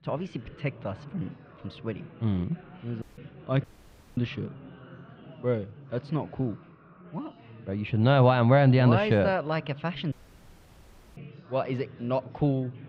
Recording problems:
muffled; slightly; fading above 3.5 kHz
chatter from many people; faint; throughout; 20 dB below the speech
audio cutting out; at 3 s, at 3.5 s for 0.5 s and at 10 s for 1 s

